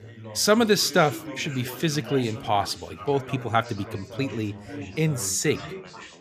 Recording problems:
background chatter; noticeable; throughout; 4 voices, 15 dB below the speech

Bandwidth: 15 kHz